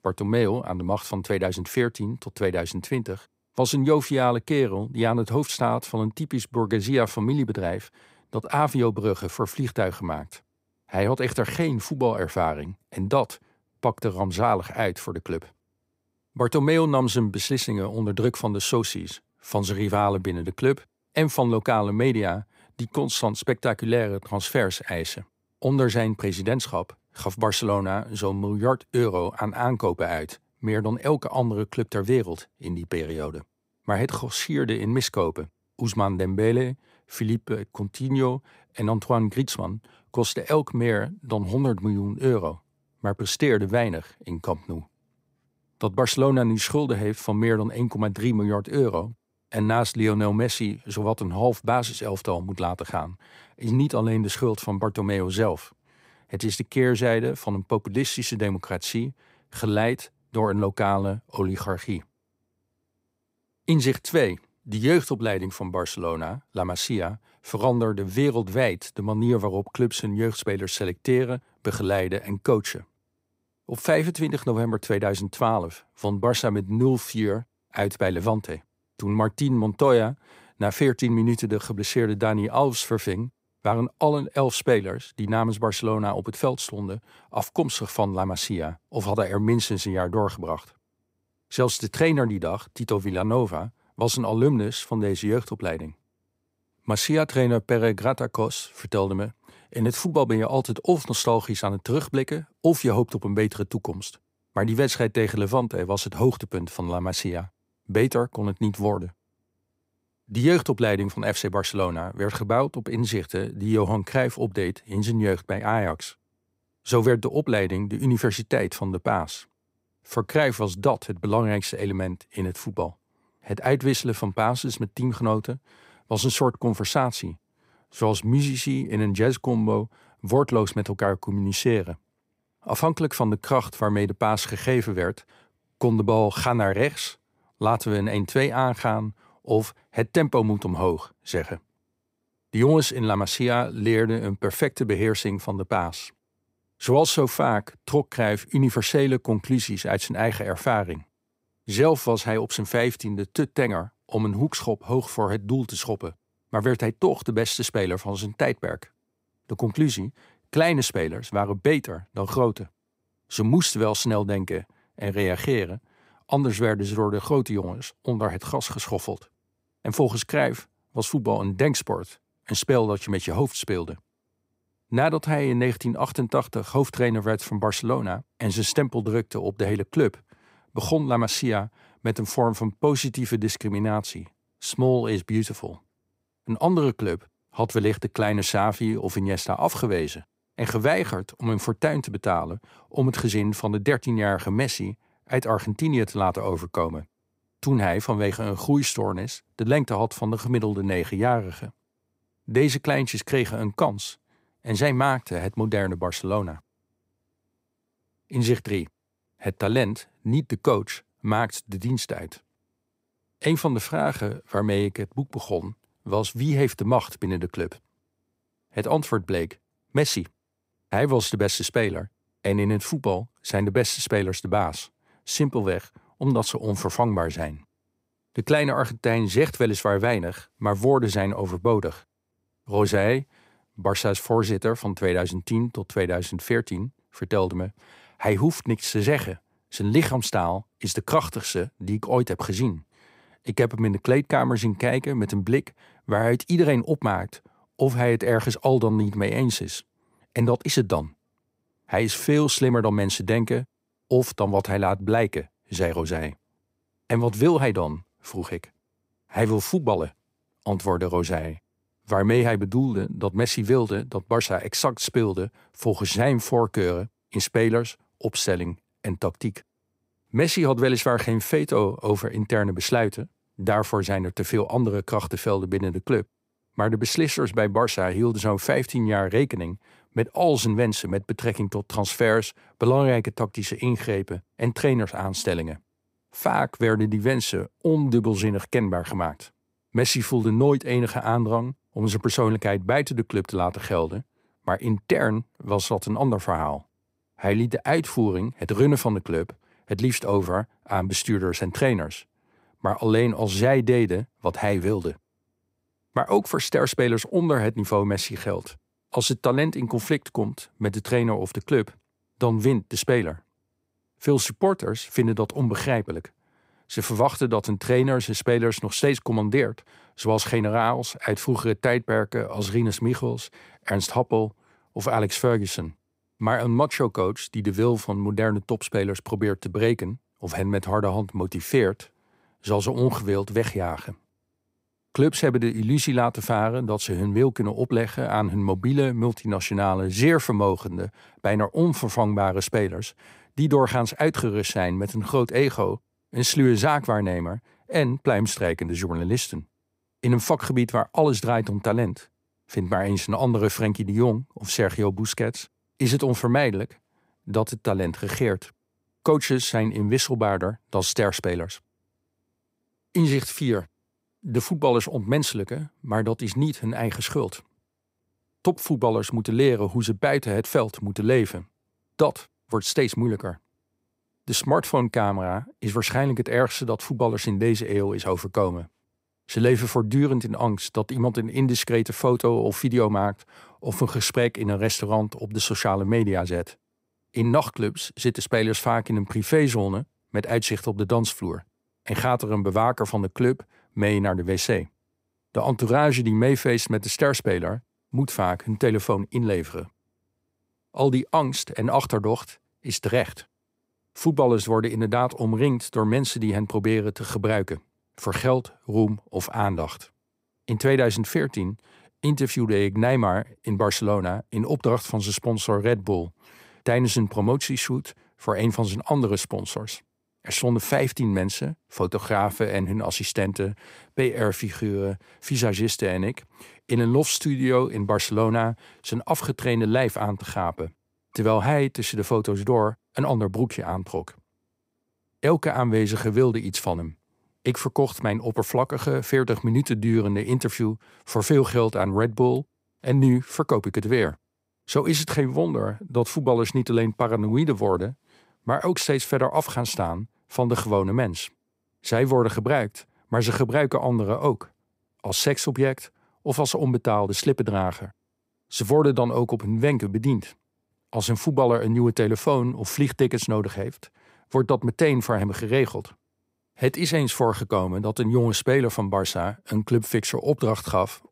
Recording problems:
none

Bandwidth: 15.5 kHz